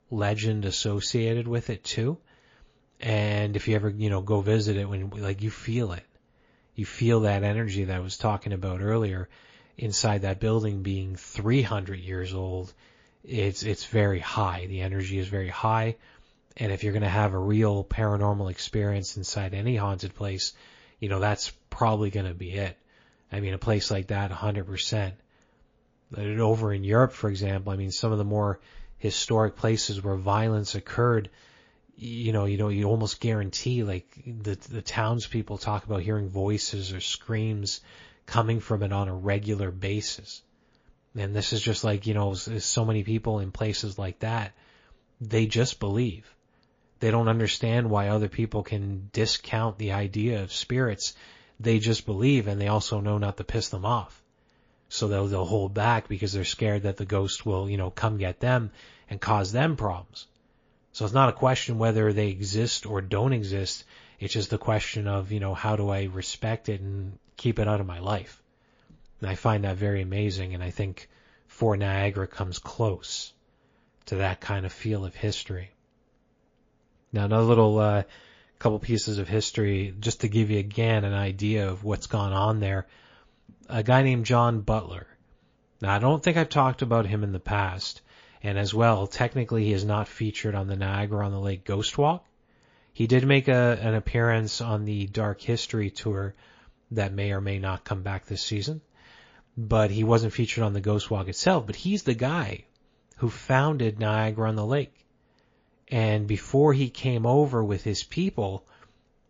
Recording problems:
garbled, watery; slightly

